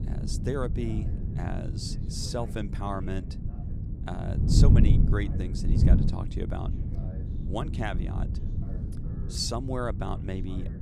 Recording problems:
wind noise on the microphone; heavy; 5 dB below the speech
voice in the background; faint; throughout; 20 dB below the speech

